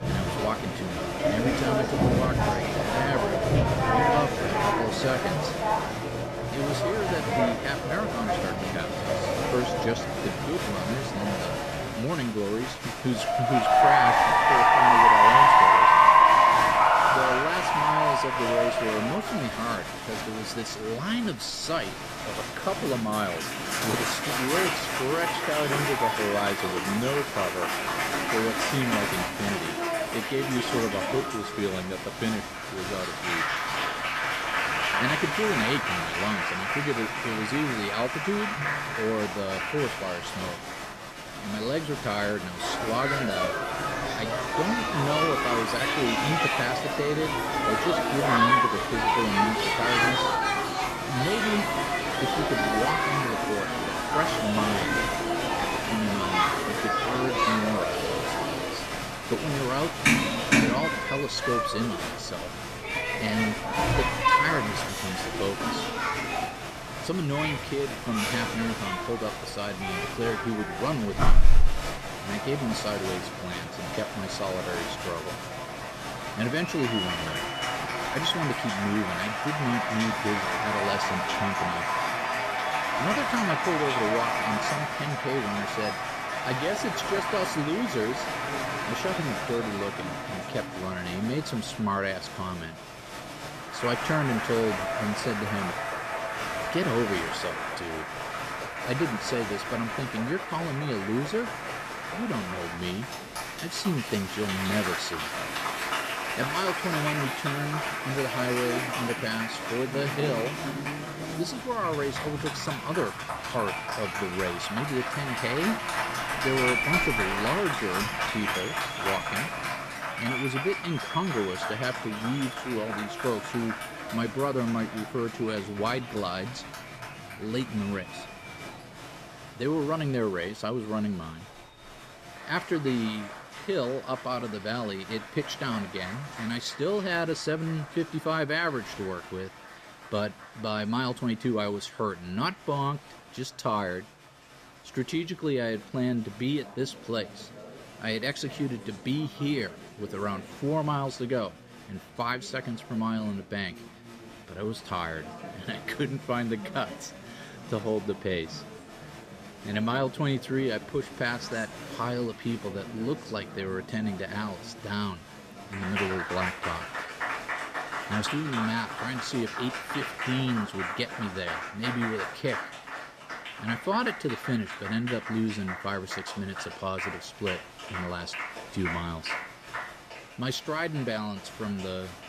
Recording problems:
crowd noise; very loud; throughout; 4 dB above the speech

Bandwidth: 14.5 kHz